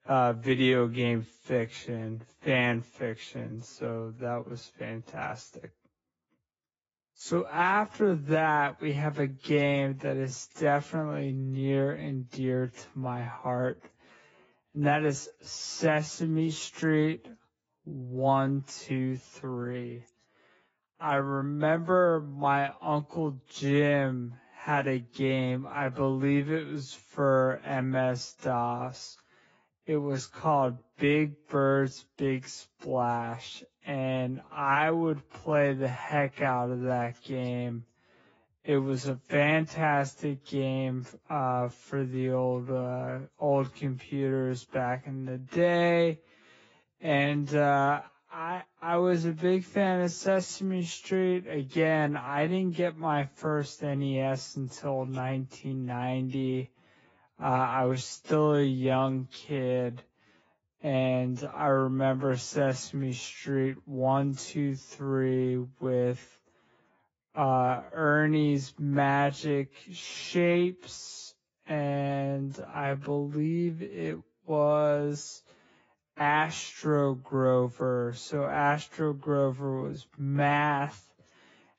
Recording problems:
garbled, watery; badly; nothing above 7.5 kHz
wrong speed, natural pitch; too slow; 0.6 times normal speed

